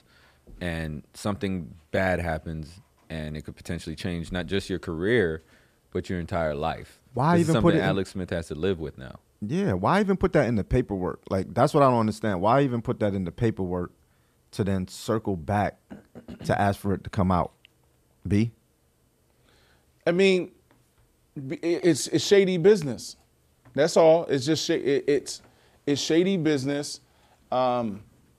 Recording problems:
none

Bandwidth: 14.5 kHz